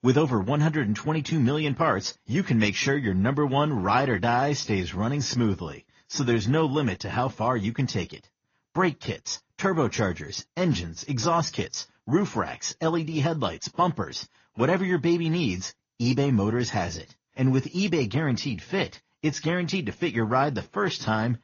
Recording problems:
garbled, watery; slightly; nothing above 6.5 kHz

